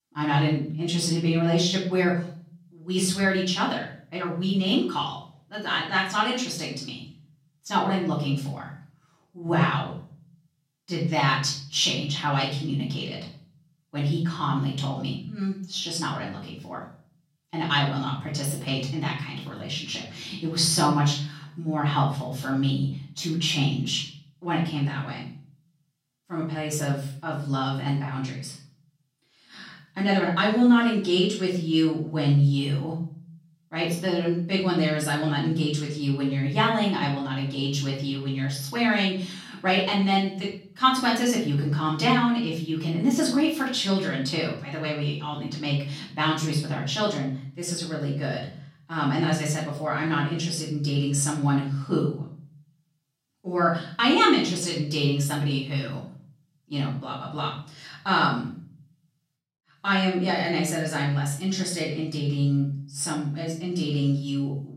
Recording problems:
off-mic speech; far
room echo; noticeable; dies away in 0.5 s

